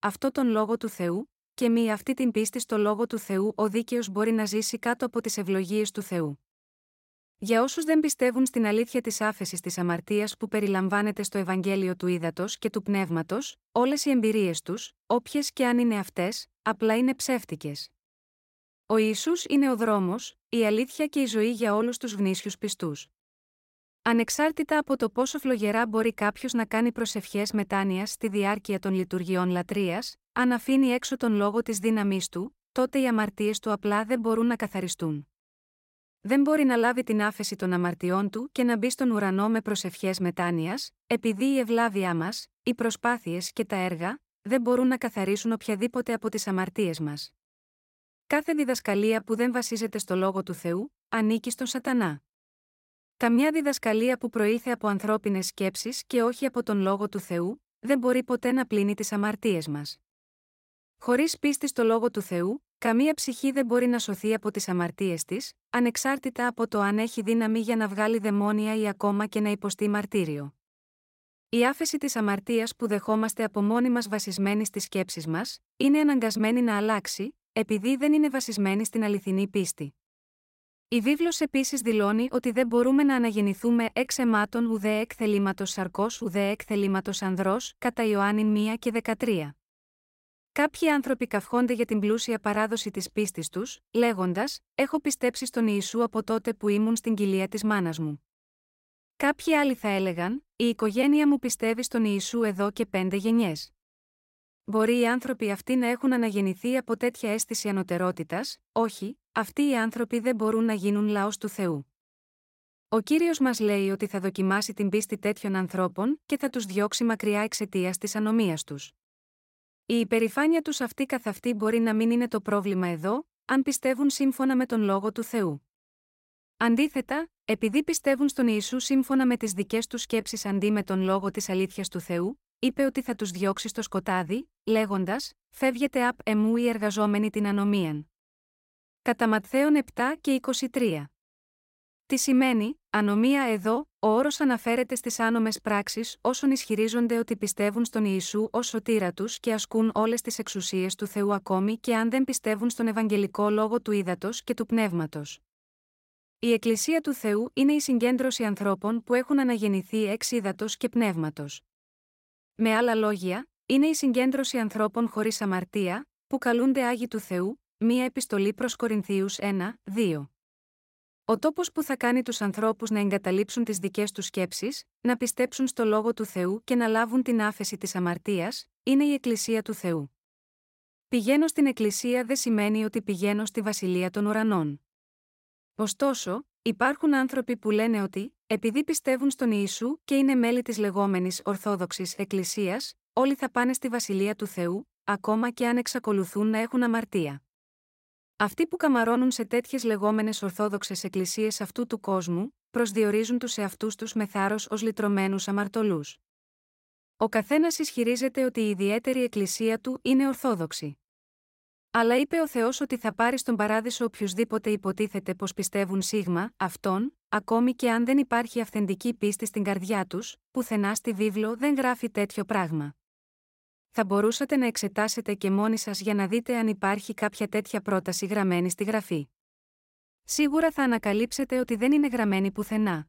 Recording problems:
none

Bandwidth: 16 kHz